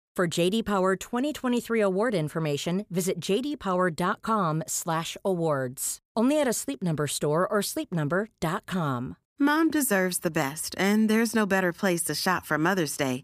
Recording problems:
none

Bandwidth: 15 kHz